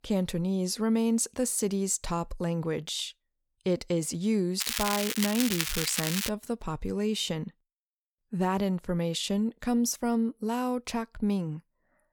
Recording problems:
crackling; loud; from 4.5 to 6.5 s; 1 dB below the speech

